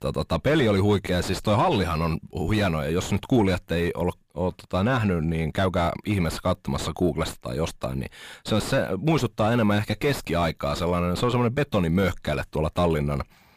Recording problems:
distortion; heavy; 5 dB below the speech

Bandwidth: 15 kHz